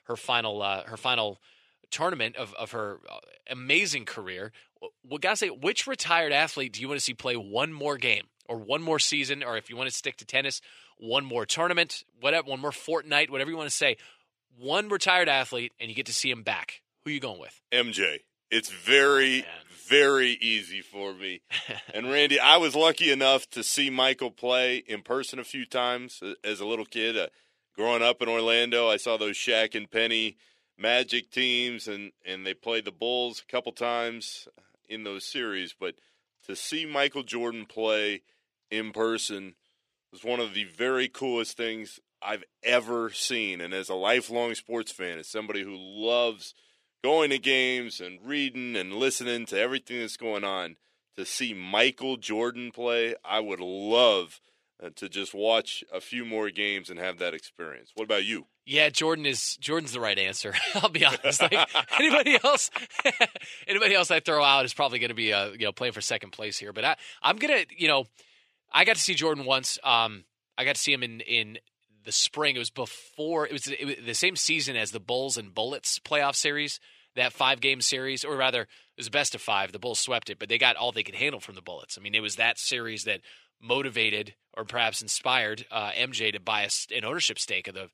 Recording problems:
thin; somewhat; fading below 400 Hz

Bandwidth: 14.5 kHz